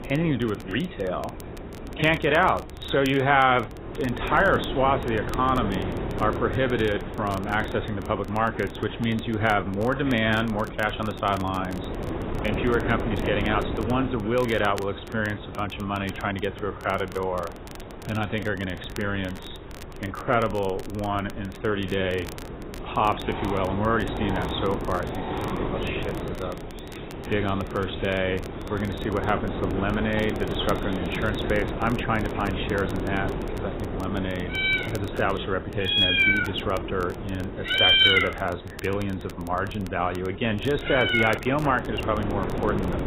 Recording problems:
garbled, watery; badly; nothing above 4 kHz
animal sounds; very loud; throughout; 3 dB above the speech
wind noise on the microphone; occasional gusts; 10 dB below the speech
crackle, like an old record; faint; 20 dB below the speech

